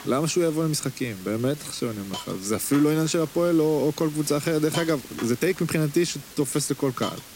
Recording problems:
hiss; noticeable; throughout; 15 dB below the speech
uneven, jittery; strongly; from 1 to 6.5 s

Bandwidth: 16 kHz